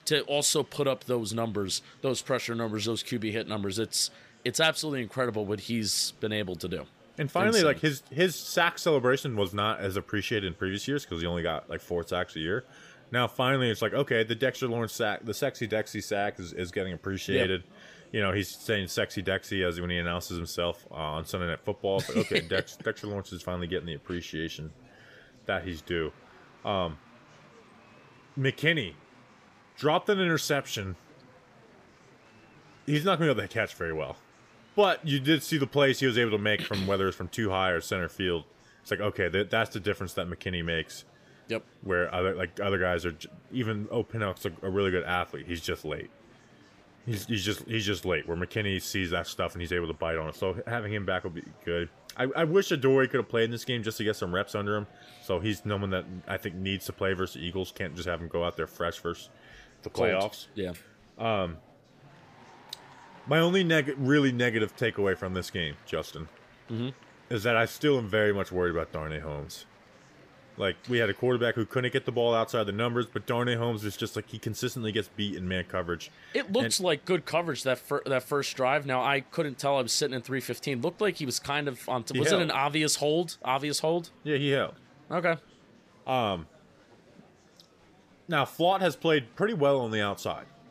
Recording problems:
murmuring crowd; faint; throughout; 25 dB below the speech

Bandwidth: 15 kHz